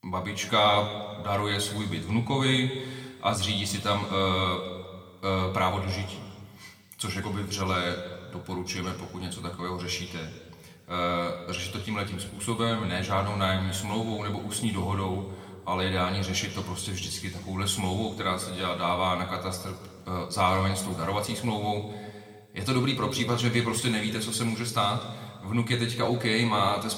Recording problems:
room echo; slight; dies away in 1.6 s
off-mic speech; somewhat distant

